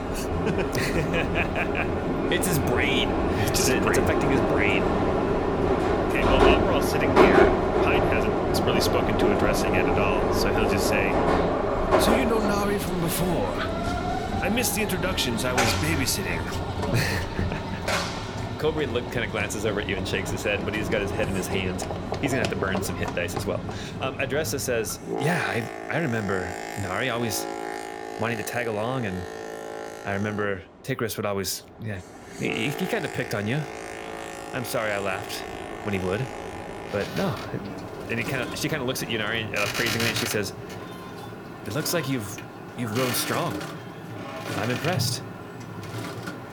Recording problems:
train or aircraft noise; very loud; throughout; 1 dB above the speech
high-pitched whine; faint; until 26 s and from 33 s on; 2.5 kHz, 35 dB below the speech

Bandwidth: 18.5 kHz